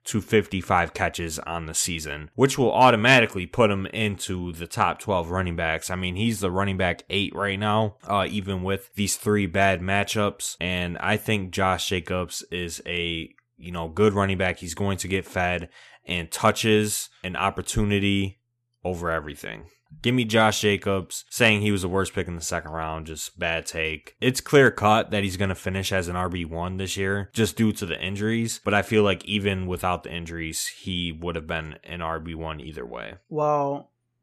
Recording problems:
none

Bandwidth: 13.5 kHz